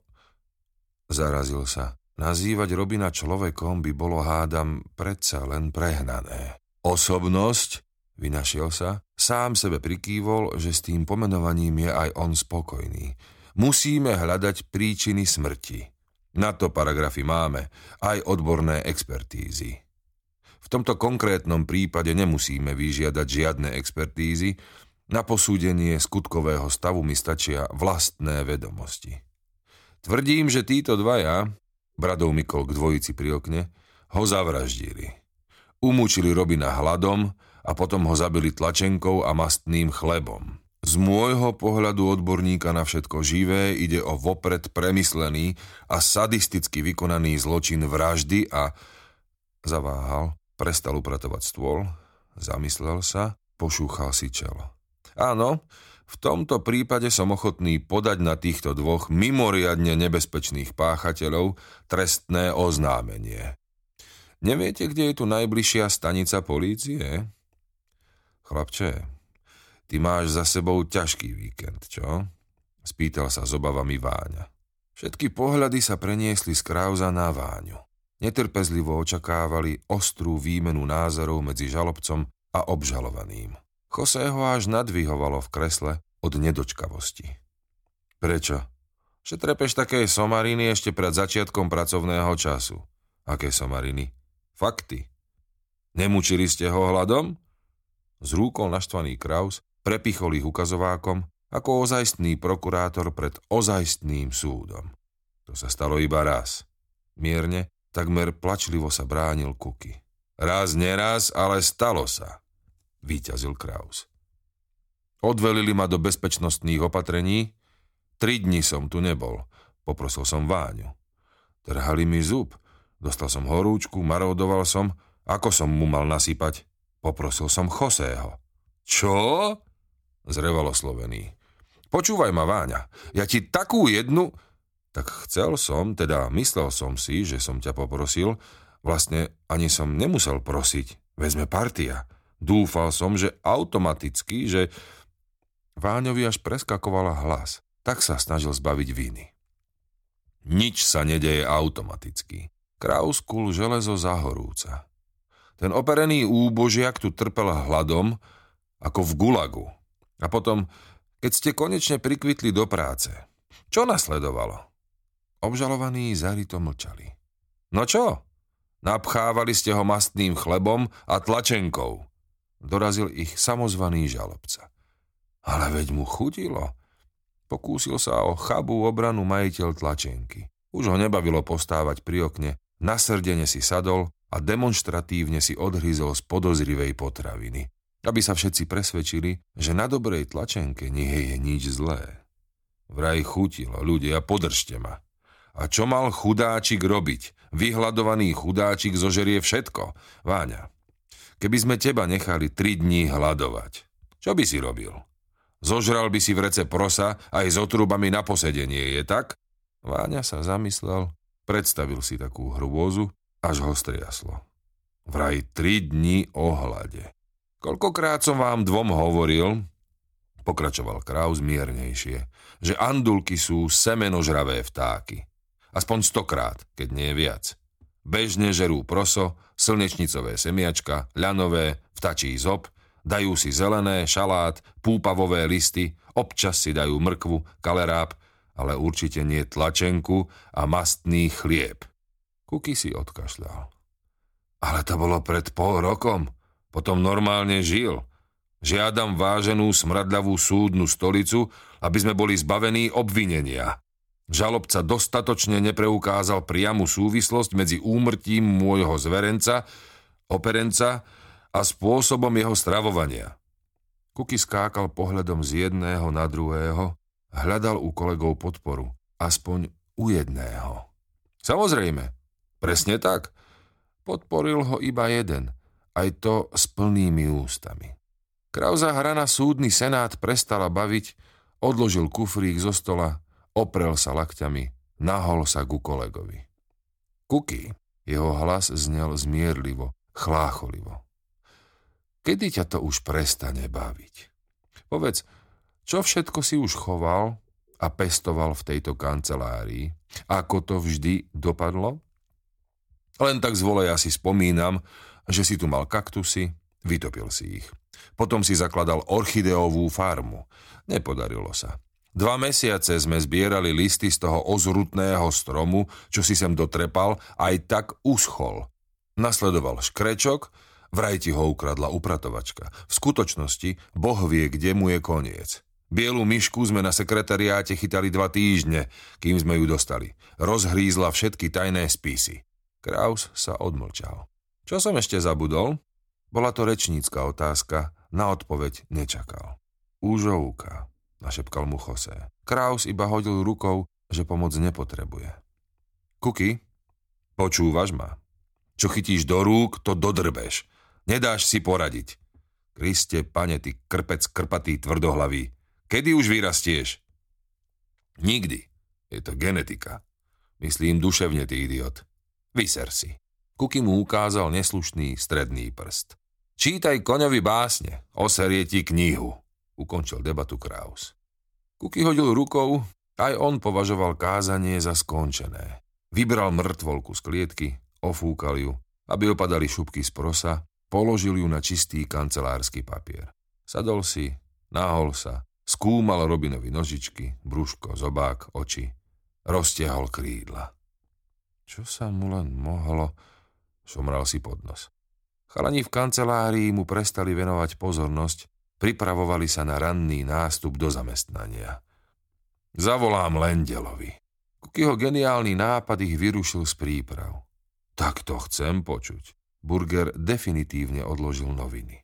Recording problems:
none

